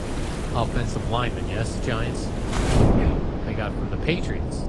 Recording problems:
garbled, watery; slightly
wind noise on the microphone; heavy; 2 dB below the speech
rain or running water; loud; throughout; 6 dB below the speech

